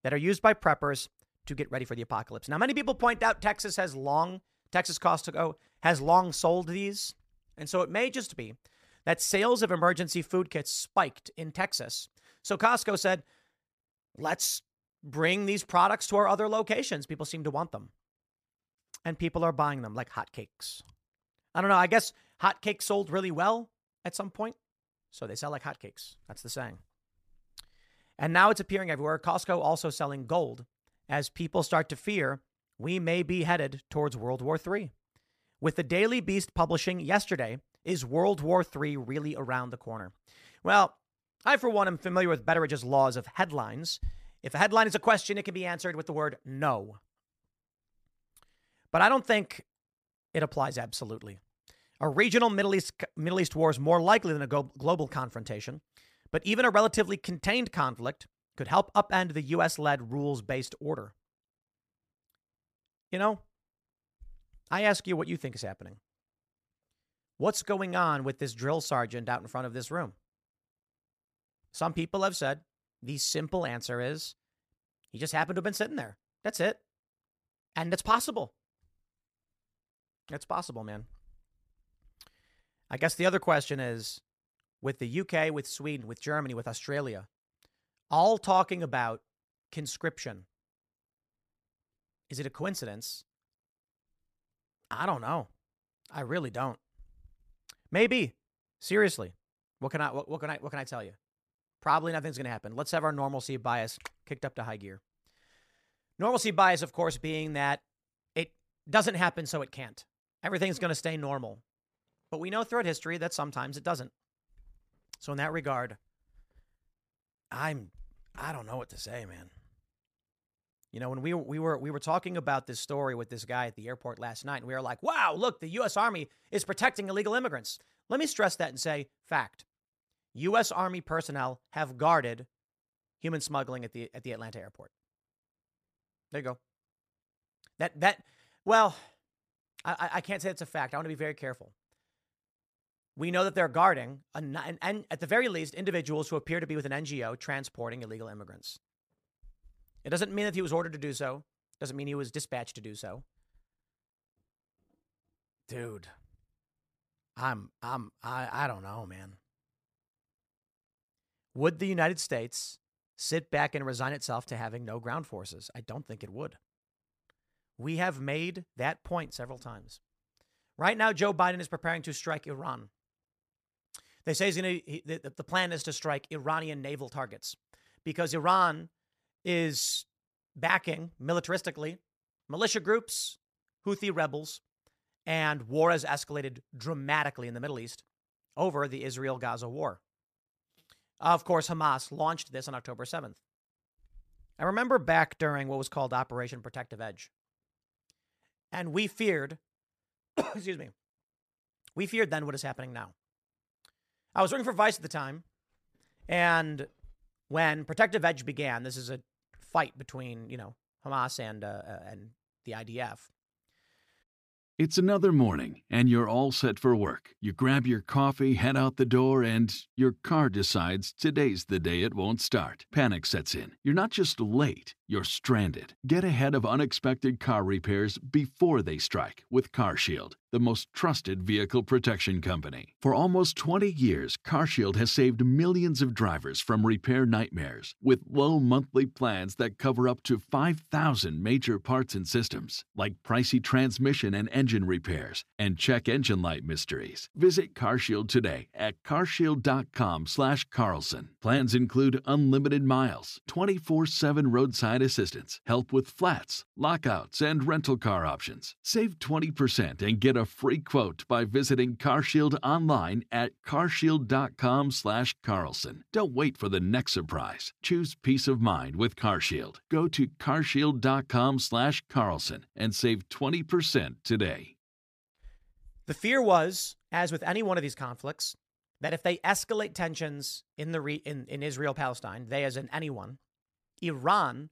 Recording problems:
none

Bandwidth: 14.5 kHz